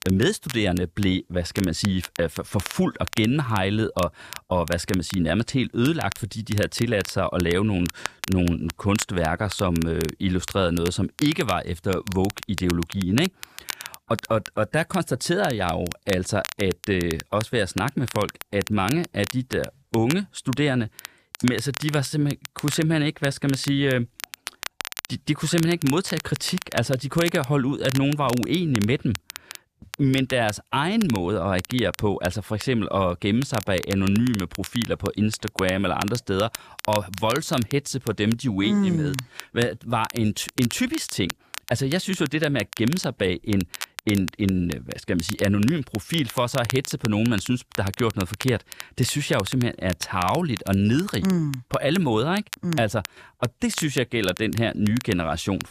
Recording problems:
crackle, like an old record; noticeable; 10 dB below the speech

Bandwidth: 14.5 kHz